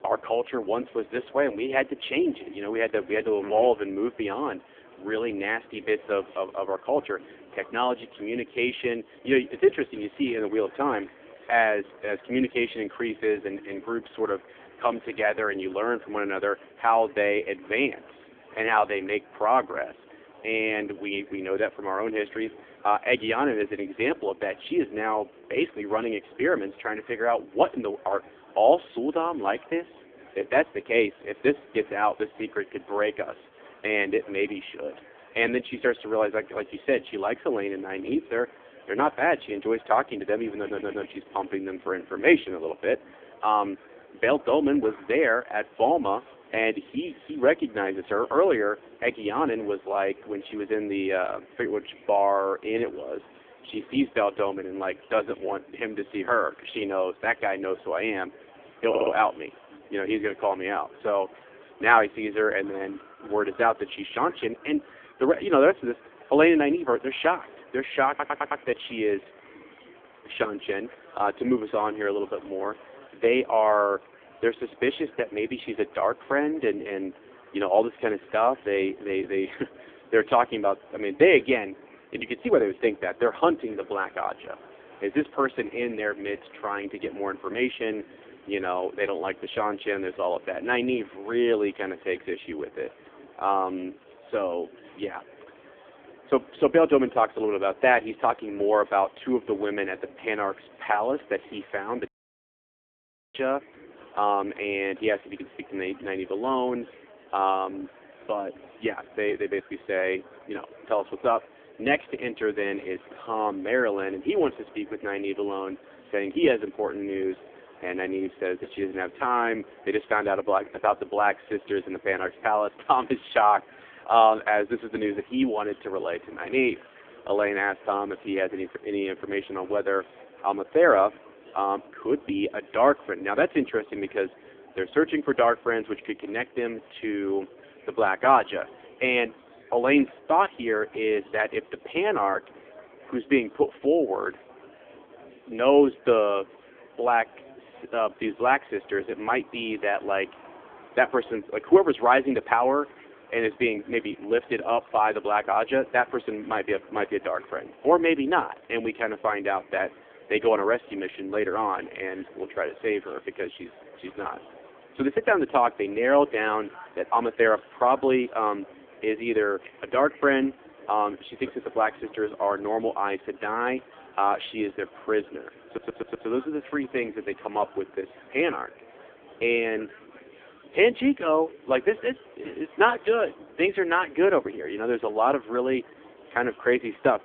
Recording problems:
phone-call audio; poor line; nothing above 3.5 kHz
murmuring crowd; faint; throughout; 25 dB below the speech
audio stuttering; 4 times, first at 41 s
audio cutting out; at 1:42 for 1.5 s

